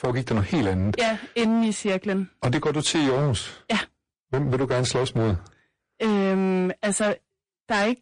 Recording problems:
distortion; heavy; 19% of the sound clipped
garbled, watery; slightly; nothing above 9 kHz

